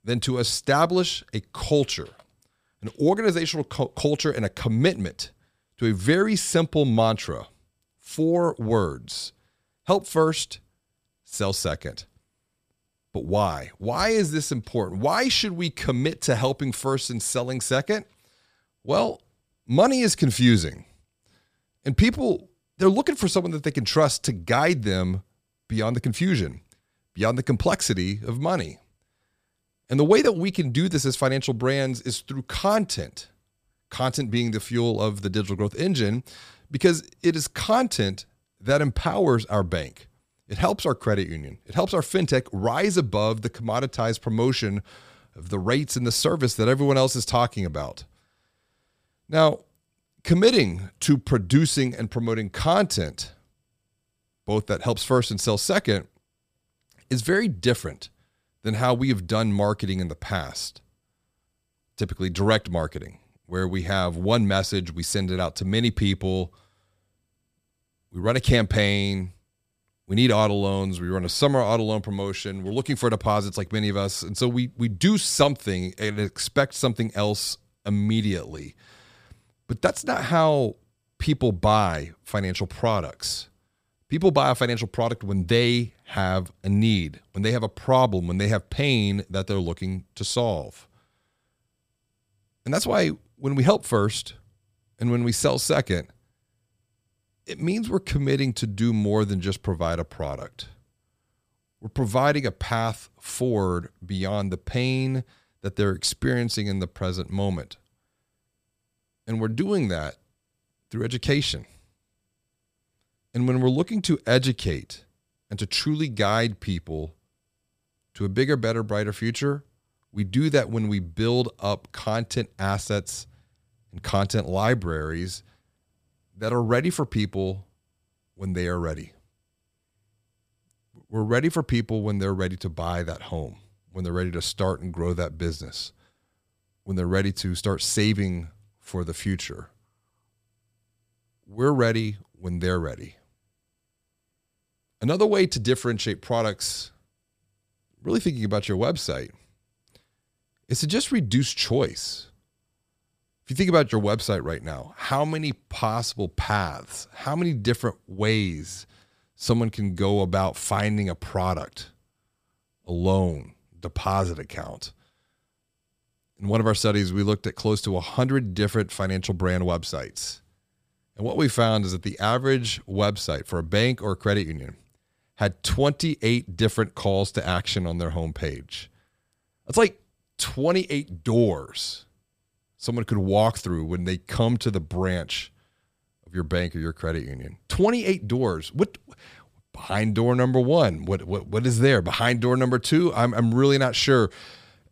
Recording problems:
none

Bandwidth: 15 kHz